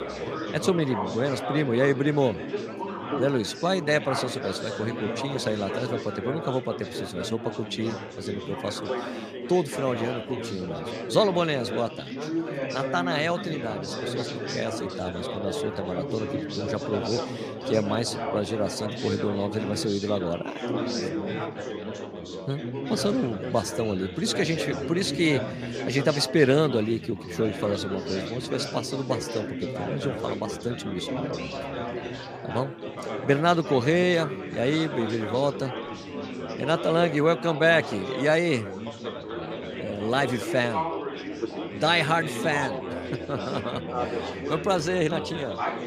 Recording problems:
chatter from many people; loud; throughout; 6 dB below the speech

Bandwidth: 15 kHz